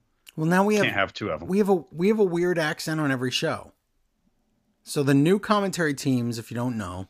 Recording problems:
none

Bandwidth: 15 kHz